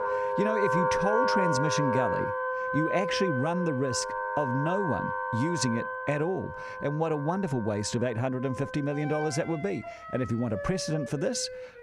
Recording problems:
background music; loud; throughout; 1 dB below the speech

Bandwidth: 15 kHz